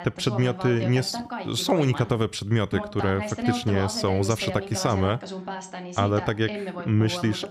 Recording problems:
voice in the background; loud; throughout; 8 dB below the speech

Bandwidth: 14.5 kHz